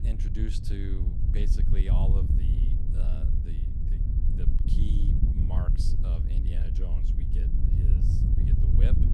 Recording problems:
wind noise on the microphone; heavy; 2 dB above the speech

